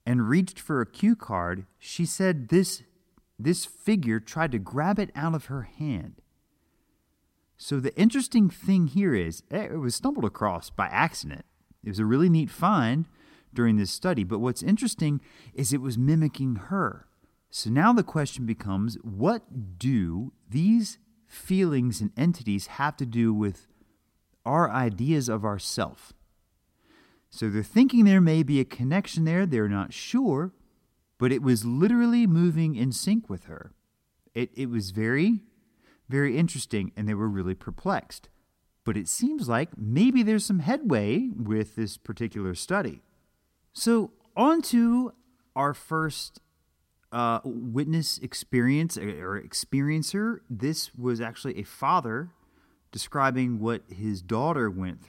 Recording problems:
none

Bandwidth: 16 kHz